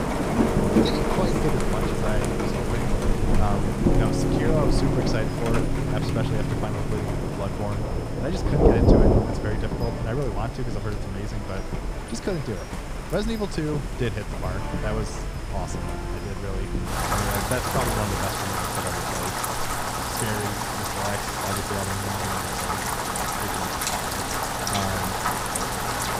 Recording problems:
rain or running water; very loud; throughout; 5 dB above the speech
background music; loud; until 18 s; as loud as the speech
high-pitched whine; faint; throughout; 5 kHz, 25 dB below the speech

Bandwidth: 15.5 kHz